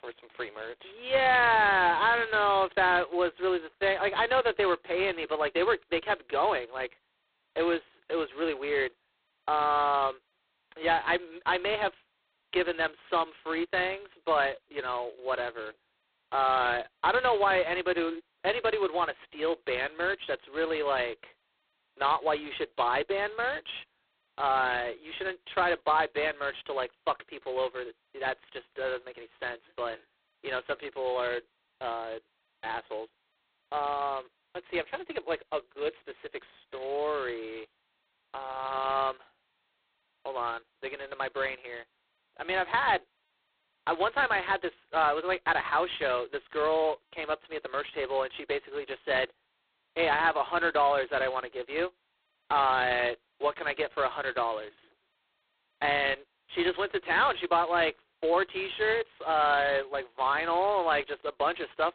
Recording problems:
phone-call audio; poor line; nothing above 4 kHz

